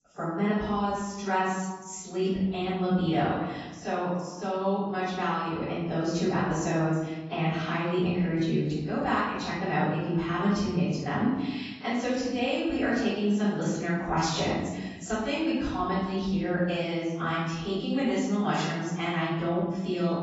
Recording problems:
off-mic speech; far
garbled, watery; badly; nothing above 7.5 kHz
room echo; noticeable; dies away in 1.1 s

